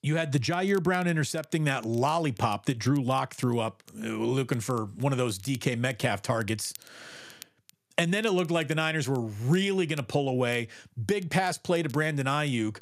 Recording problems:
crackle, like an old record; faint; 25 dB below the speech

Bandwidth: 14.5 kHz